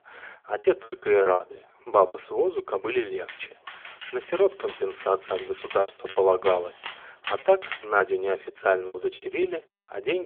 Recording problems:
phone-call audio; poor line; nothing above 3.5 kHz
choppy; very; 9% of the speech affected
dog barking; noticeable; from 3.5 to 8 s; peak 10 dB below the speech
abrupt cut into speech; at the end

